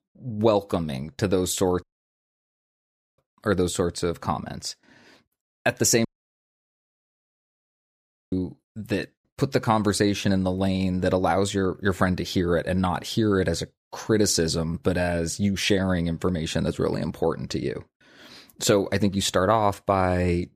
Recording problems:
audio cutting out; at 2 s for 1.5 s and at 6 s for 2.5 s

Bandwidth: 15 kHz